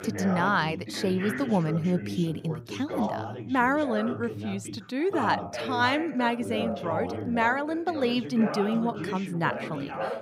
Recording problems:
background chatter; loud; throughout; 2 voices, 7 dB below the speech

